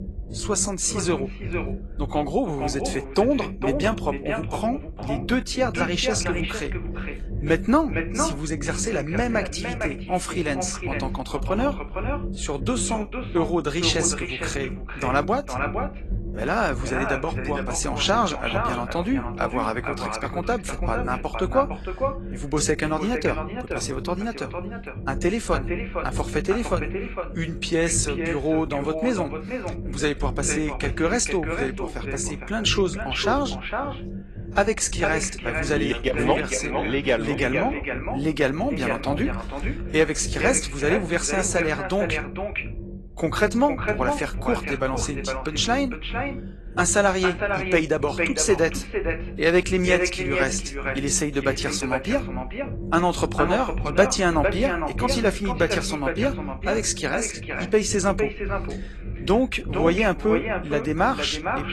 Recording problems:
echo of what is said; strong; throughout; 460 ms later, 6 dB below the speech
garbled, watery; slightly
low rumble; noticeable; throughout; 20 dB below the speech

